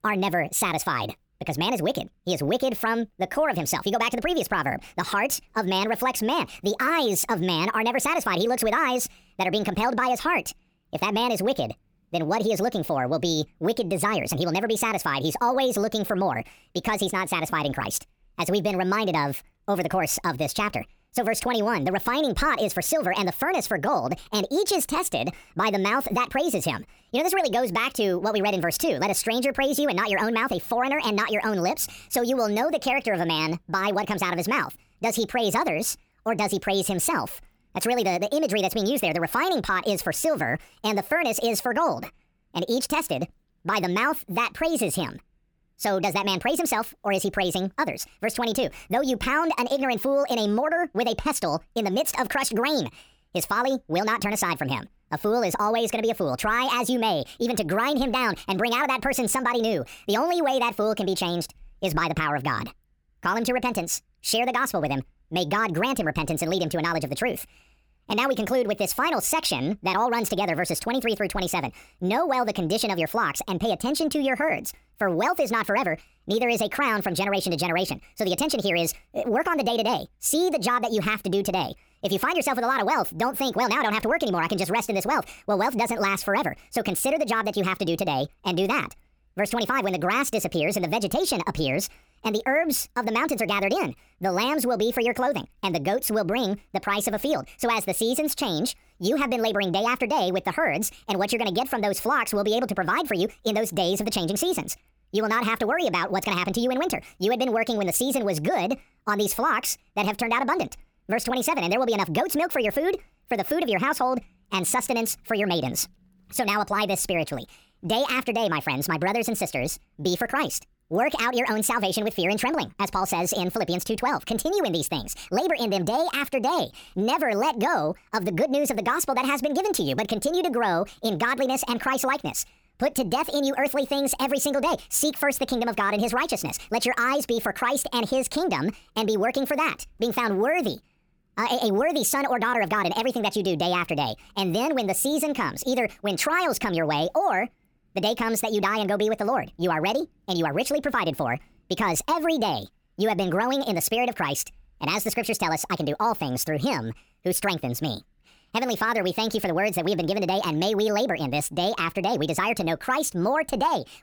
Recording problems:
wrong speed and pitch; too fast and too high; 1.5 times normal speed

